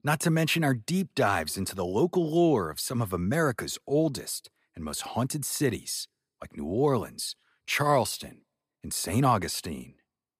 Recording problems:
none

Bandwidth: 15 kHz